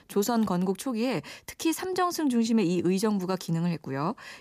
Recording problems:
none

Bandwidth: 15 kHz